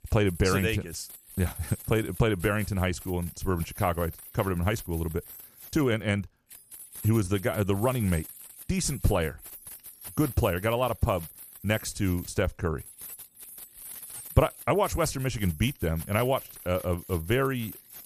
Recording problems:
household noises; noticeable; throughout; 15 dB below the speech

